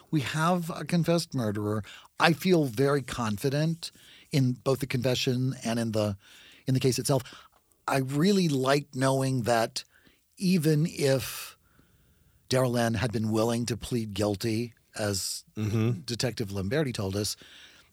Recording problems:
uneven, jittery; strongly; from 1.5 to 17 s

